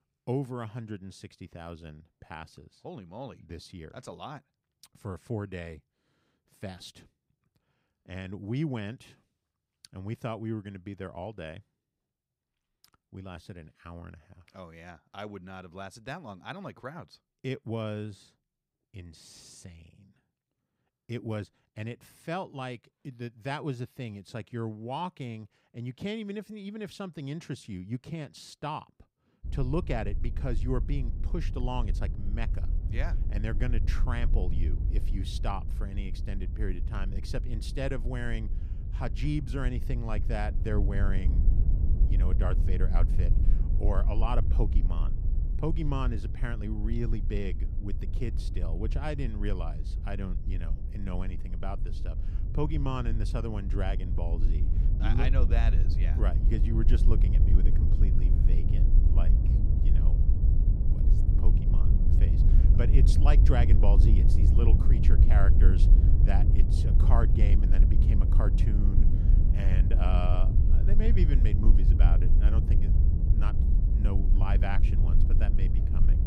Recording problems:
low rumble; loud; from 29 s on; 5 dB below the speech

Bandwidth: 15.5 kHz